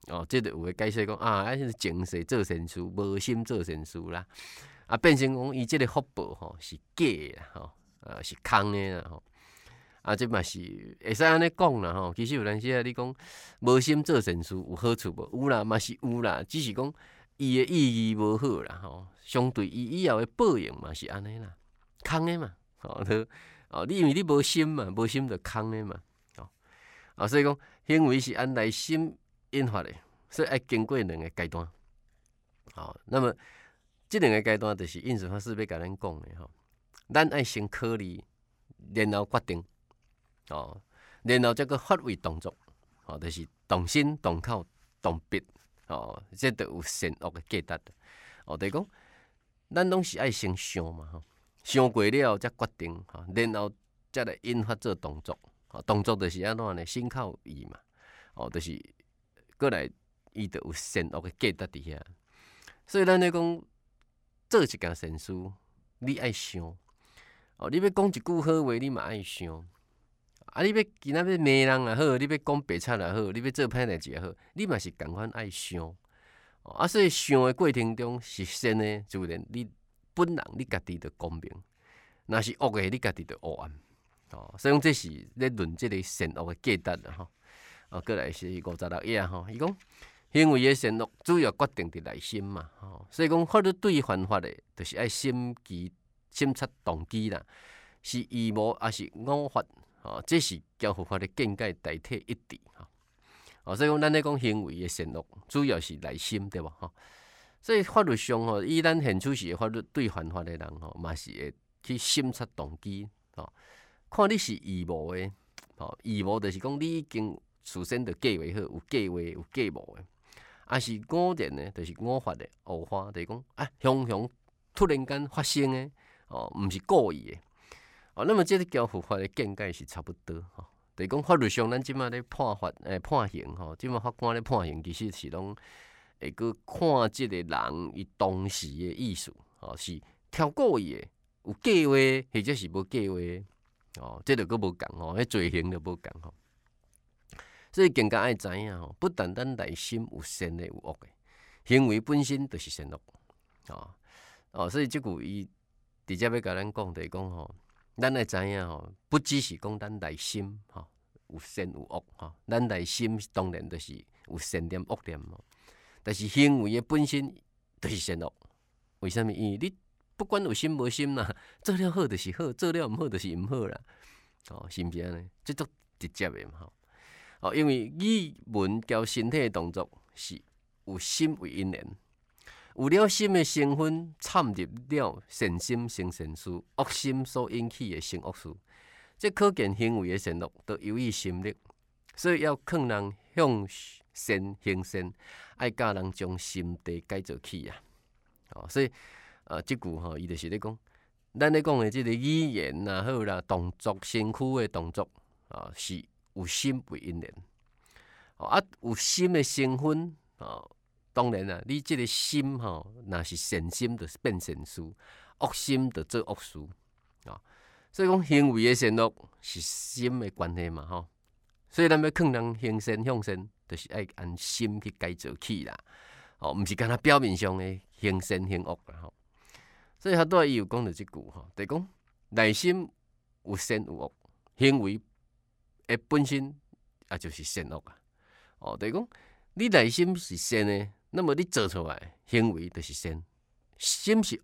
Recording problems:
none

